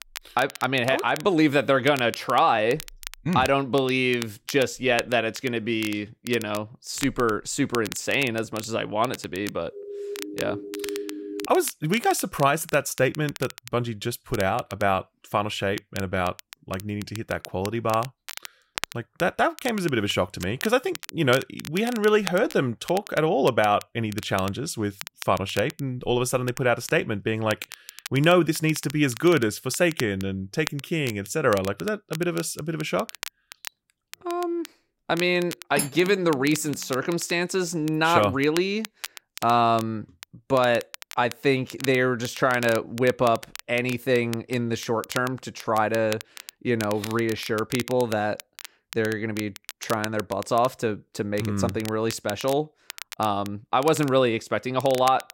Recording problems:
crackle, like an old record; noticeable; 15 dB below the speech
siren; noticeable; from 9.5 to 11 s; peak 8 dB below the speech
clattering dishes; noticeable; at 36 s; peak 5 dB below the speech

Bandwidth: 16 kHz